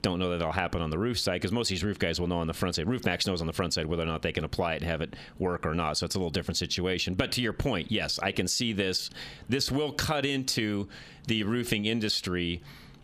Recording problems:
squashed, flat; somewhat

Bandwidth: 14.5 kHz